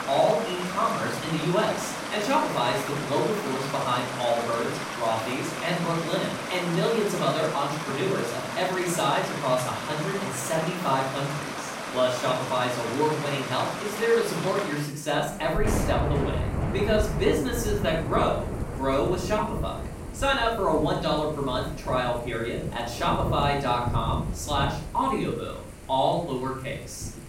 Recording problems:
off-mic speech; far
room echo; noticeable; dies away in 0.5 s
rain or running water; loud; throughout; 5 dB below the speech

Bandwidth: 16 kHz